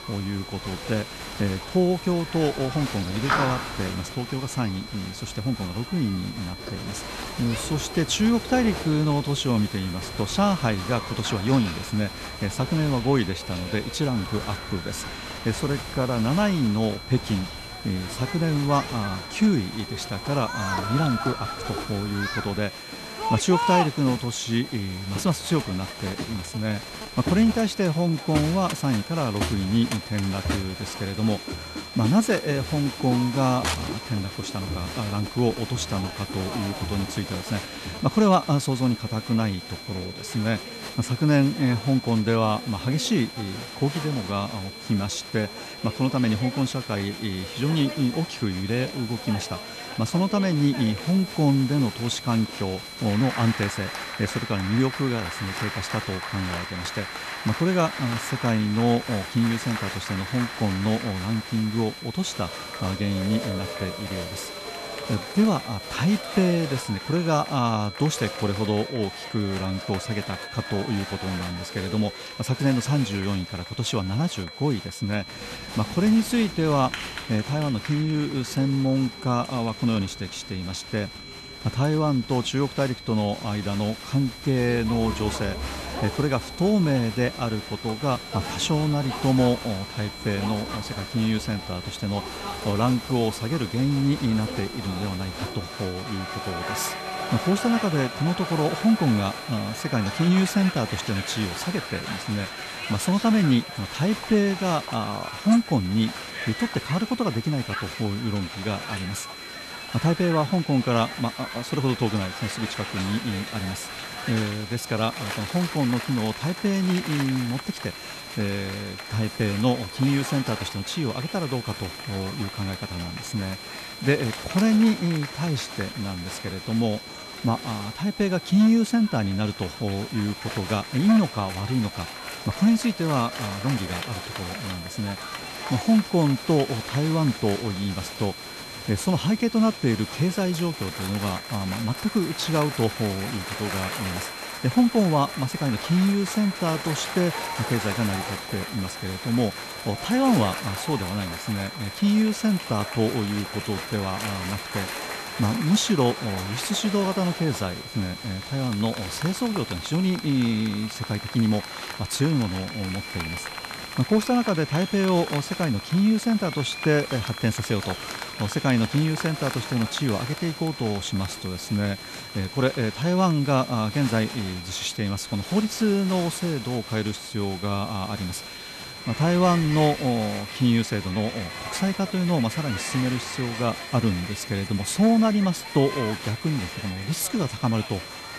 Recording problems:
crowd noise; loud; throughout; 10 dB below the speech
high-pitched whine; noticeable; throughout; 4 kHz, 15 dB below the speech
hiss; faint; until 1:08 and from 1:24 on; 20 dB below the speech

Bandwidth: 13.5 kHz